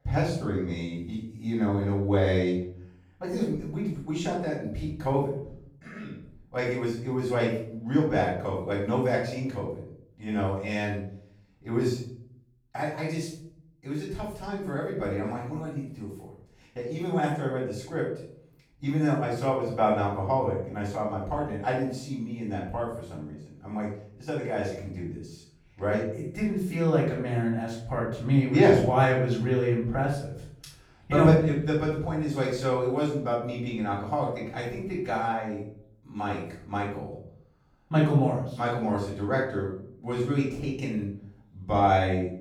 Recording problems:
off-mic speech; far
room echo; noticeable; dies away in 0.6 s

